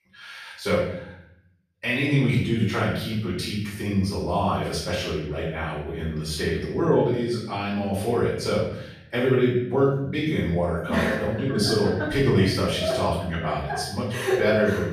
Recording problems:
off-mic speech; far
room echo; noticeable; dies away in 0.7 s

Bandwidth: 14.5 kHz